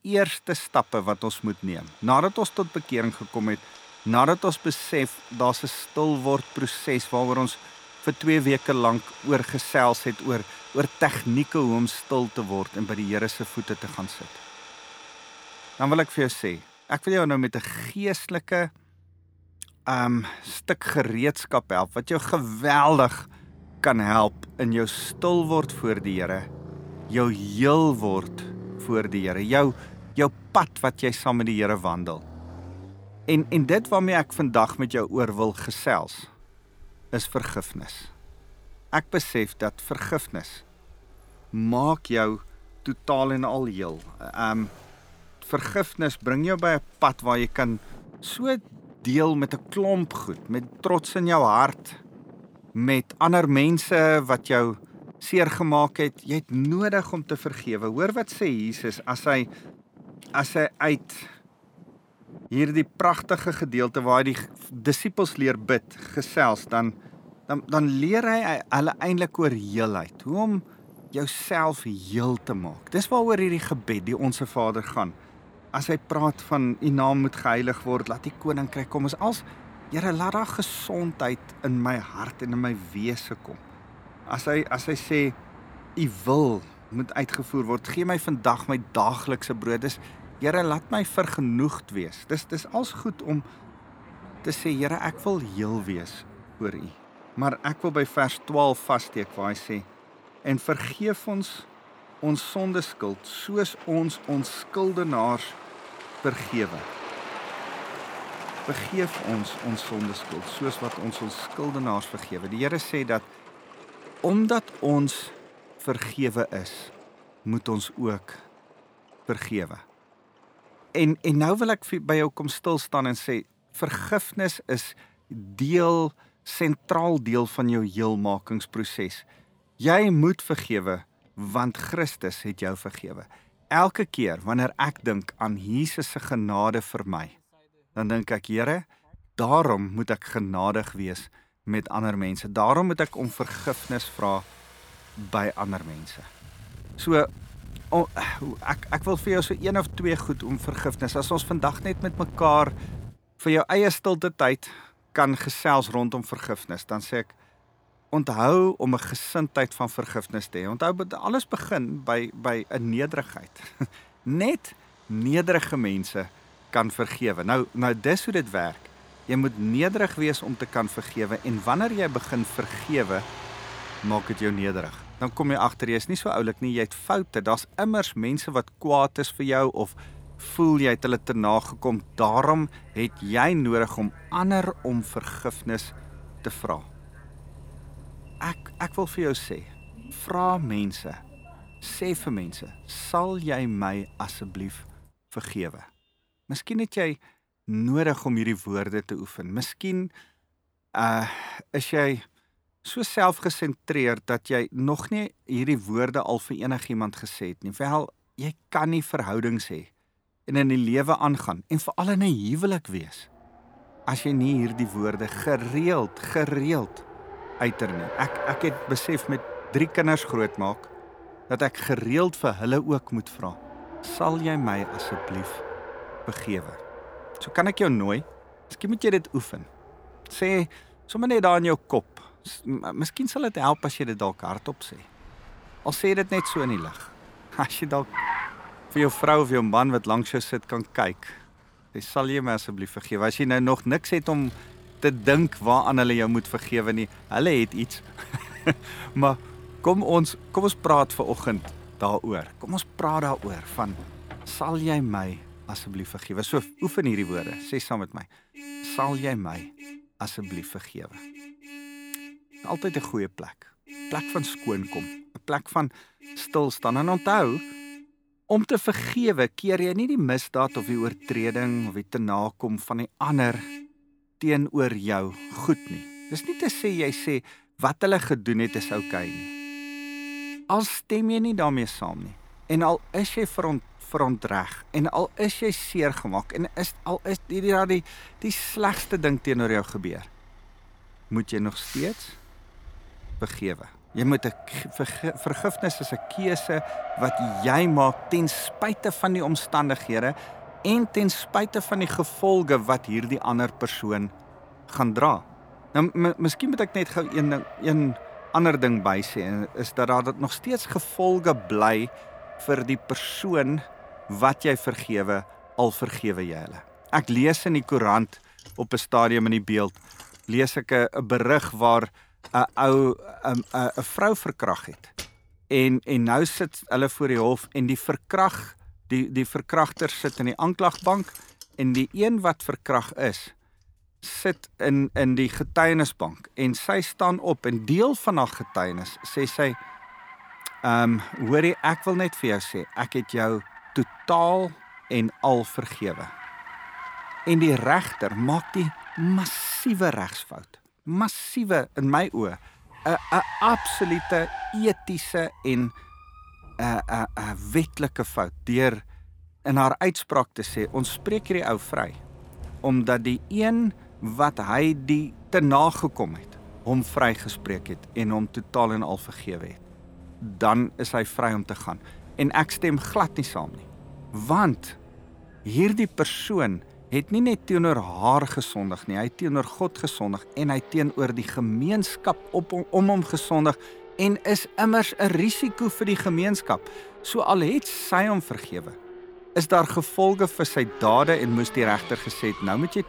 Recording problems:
traffic noise; noticeable; throughout; 15 dB below the speech

